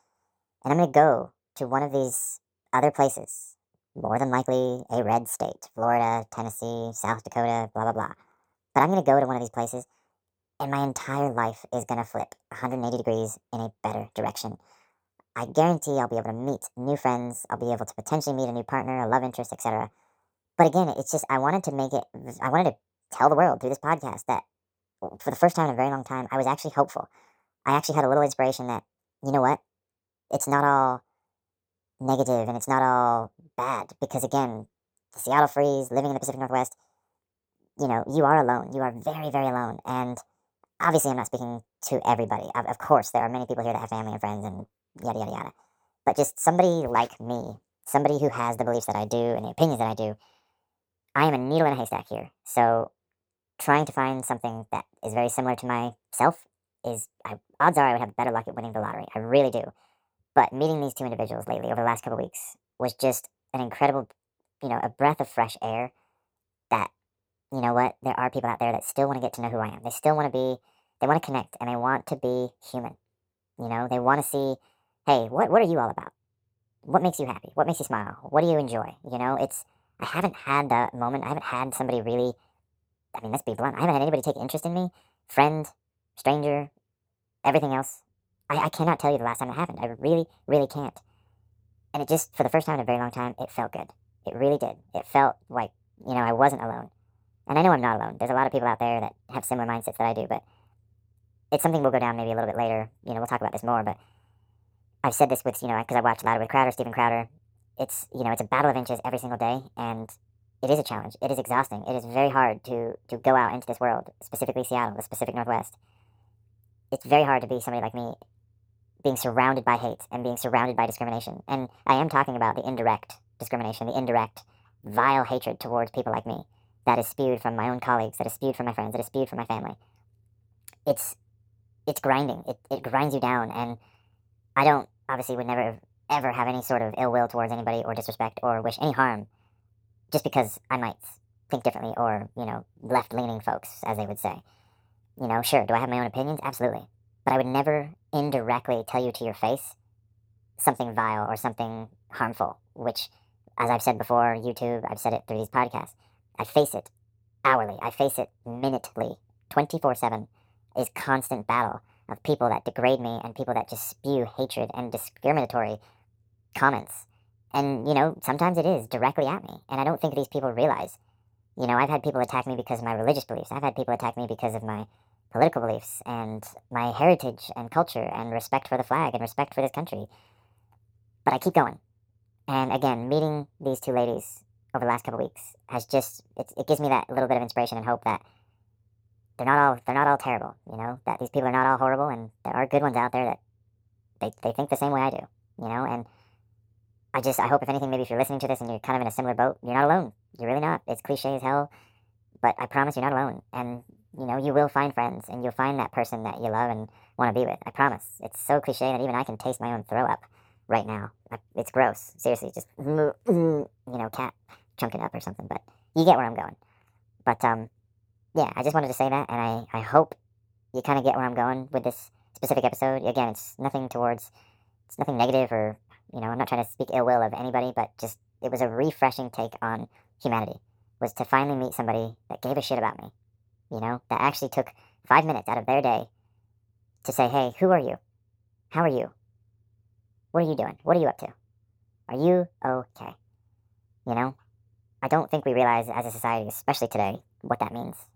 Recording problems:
wrong speed and pitch; too fast and too high; 1.5 times normal speed

